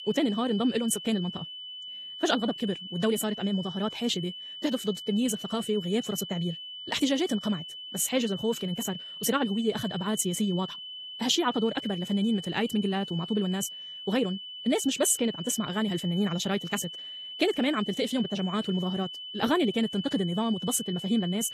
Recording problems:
wrong speed, natural pitch; too fast; 1.7 times normal speed
garbled, watery; slightly; nothing above 14 kHz
high-pitched whine; loud; throughout; 3 kHz, 9 dB below the speech

